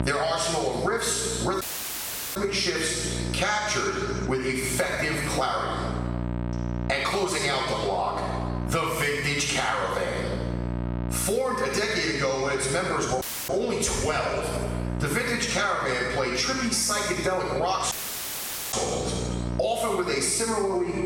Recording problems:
room echo; strong; dies away in 1 s
off-mic speech; far
squashed, flat; somewhat
electrical hum; noticeable; throughout; 60 Hz, 15 dB below the speech
audio cutting out; at 1.5 s for 0.5 s, at 13 s and at 18 s for 1 s

